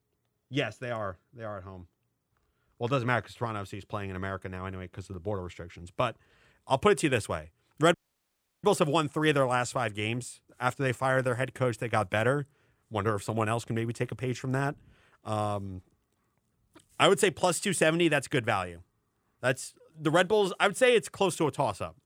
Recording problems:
audio cutting out; at 8 s for 0.5 s

